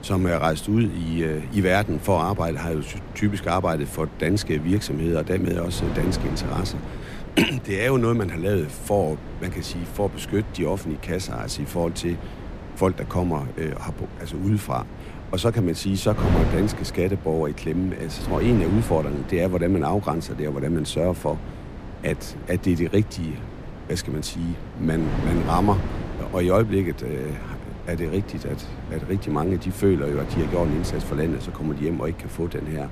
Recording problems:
wind noise on the microphone; occasional gusts; 10 dB below the speech

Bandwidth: 14.5 kHz